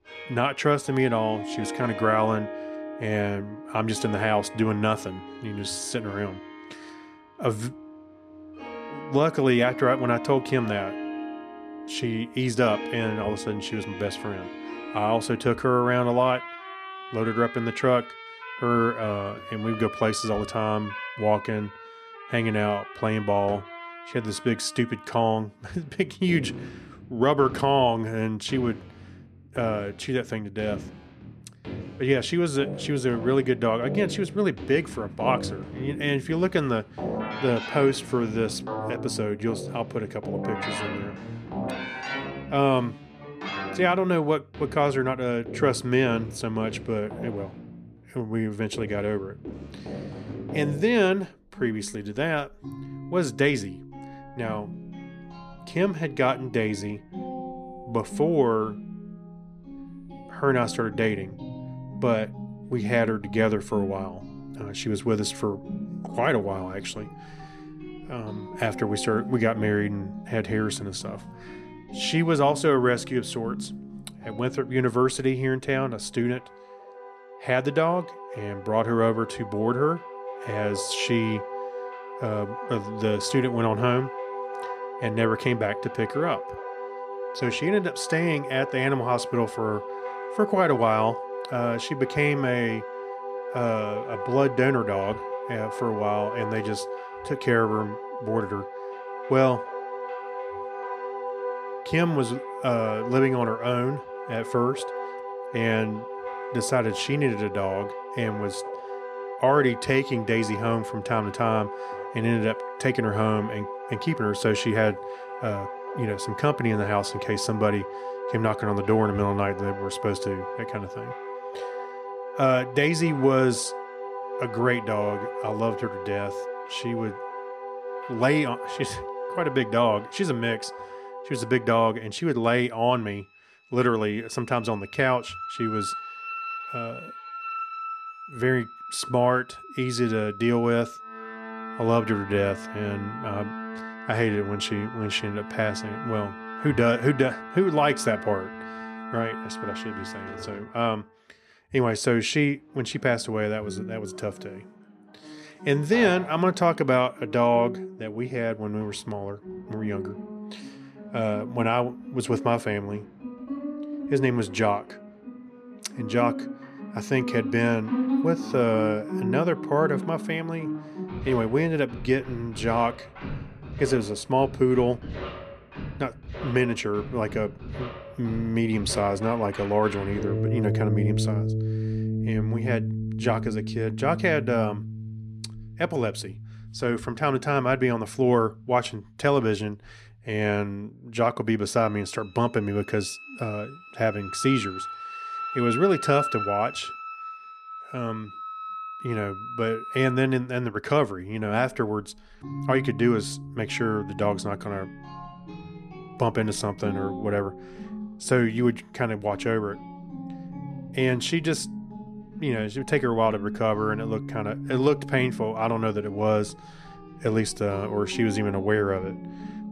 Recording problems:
background music; loud; throughout; 10 dB below the speech

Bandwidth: 14 kHz